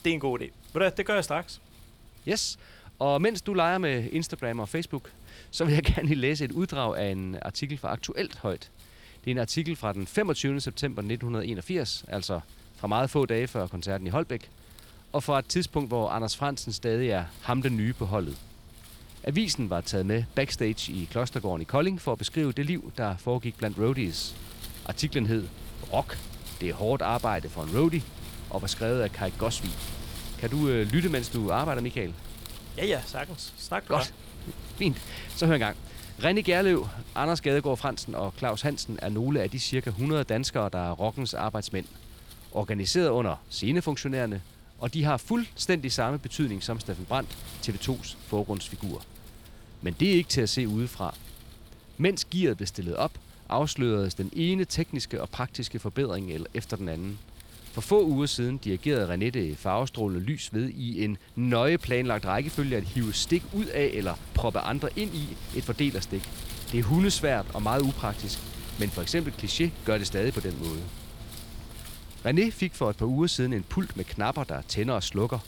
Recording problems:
wind noise on the microphone; occasional gusts; 20 dB below the speech

